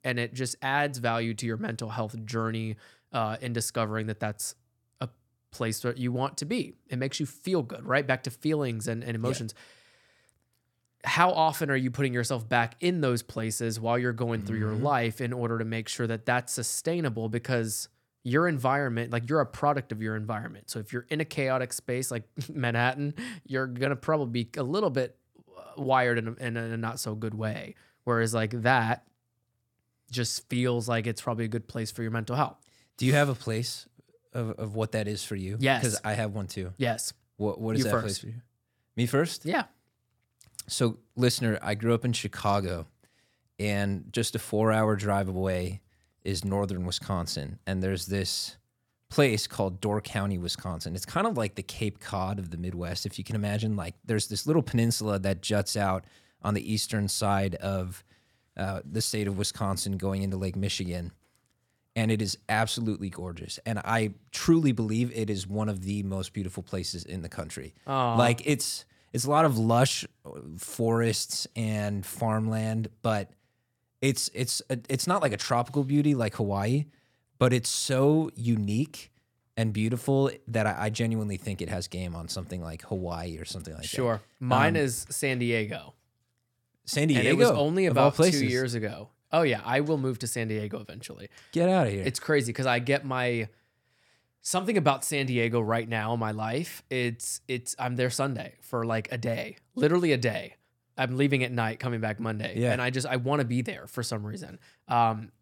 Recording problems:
none

